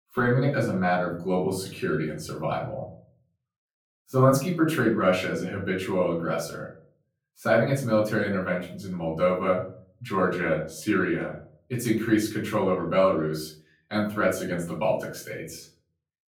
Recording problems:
off-mic speech; far
room echo; slight; dies away in 0.4 s

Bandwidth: 18.5 kHz